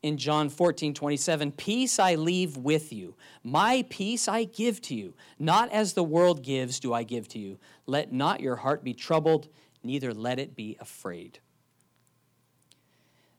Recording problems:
none

